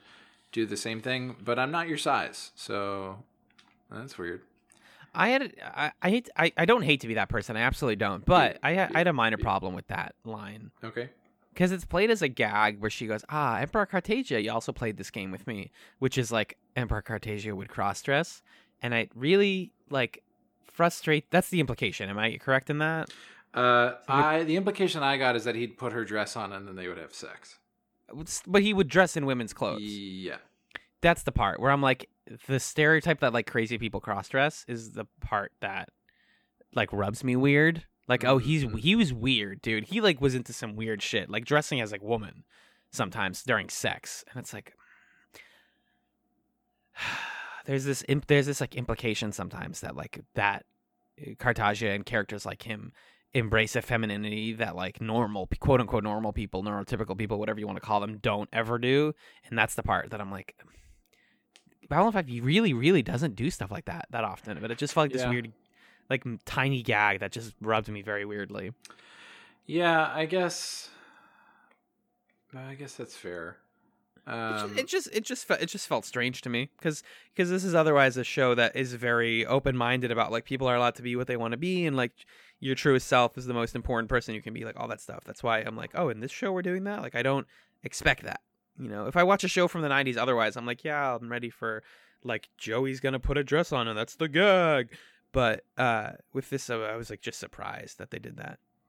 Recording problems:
none

